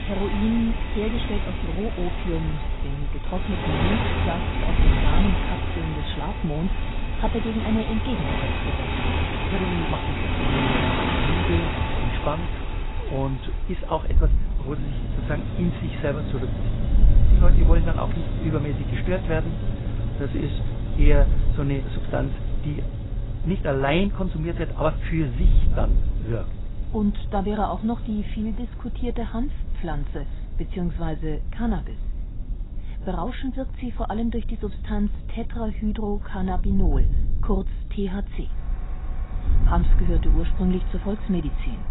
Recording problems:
garbled, watery; badly; nothing above 4 kHz
traffic noise; loud; throughout; 1 dB below the speech
wind noise on the microphone; occasional gusts; 15 dB below the speech

